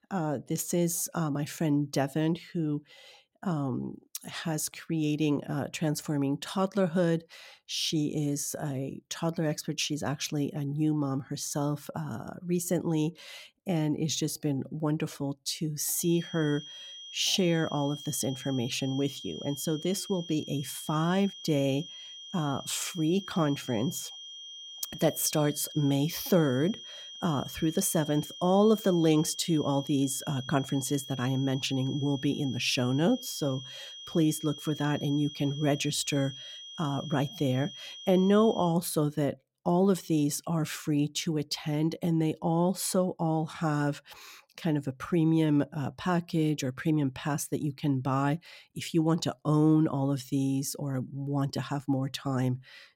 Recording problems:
high-pitched whine; noticeable; from 16 to 39 s; 3 kHz, 15 dB below the speech

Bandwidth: 16.5 kHz